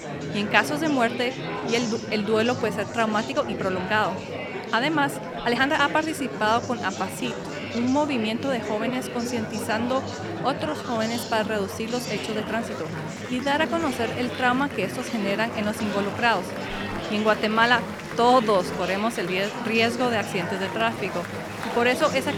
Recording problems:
murmuring crowd; loud; throughout; 7 dB below the speech
uneven, jittery; strongly; from 1.5 to 21 s

